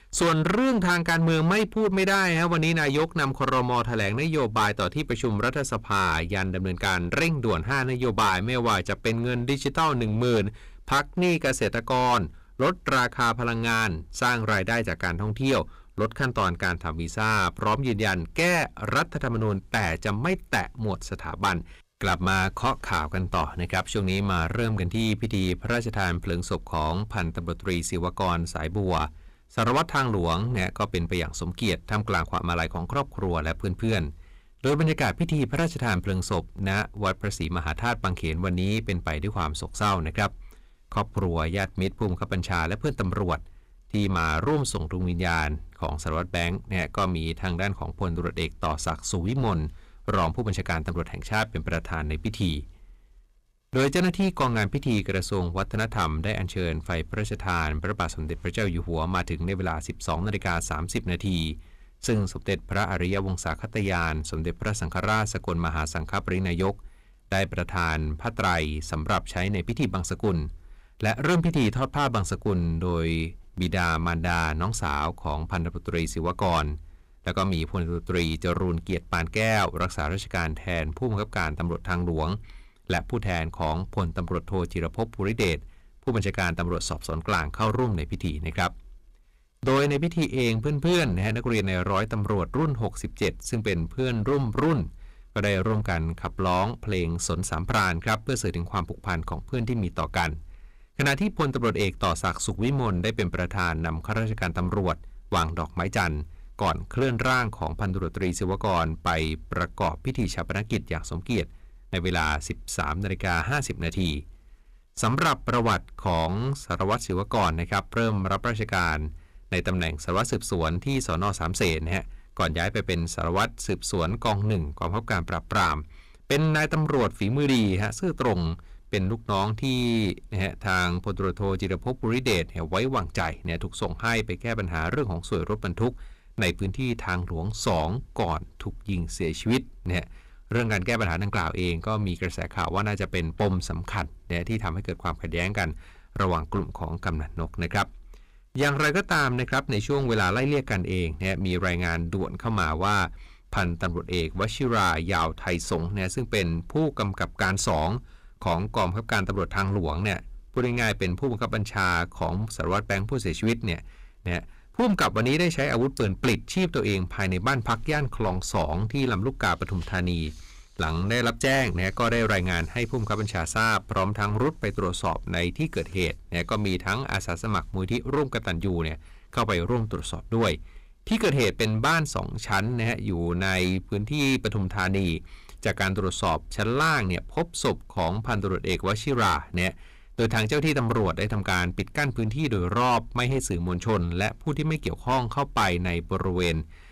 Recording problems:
distortion; heavy; 8% of the sound clipped

